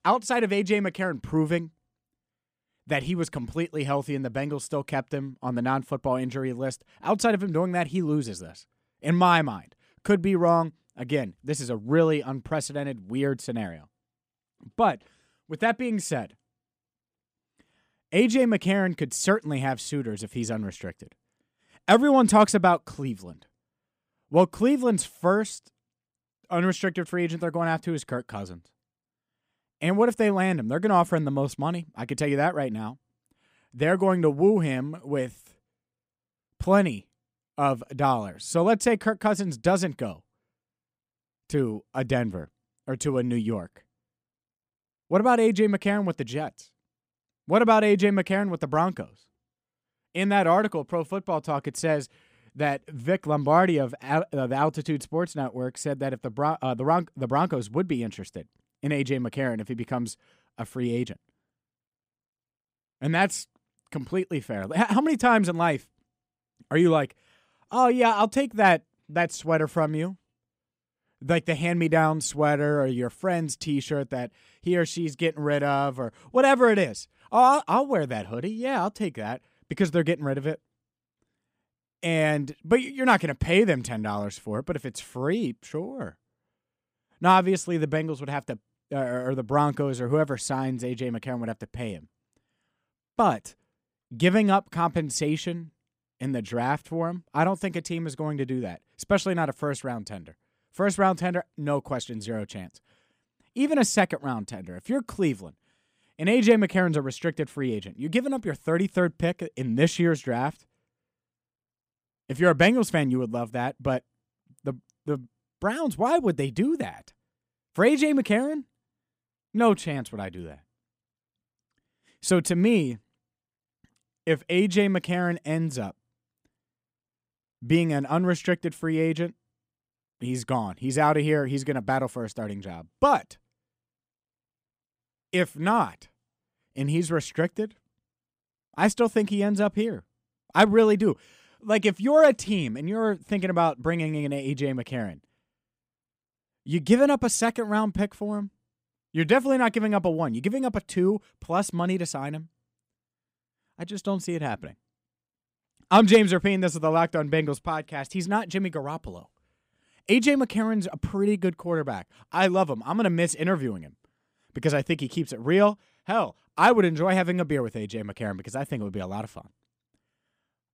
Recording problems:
none

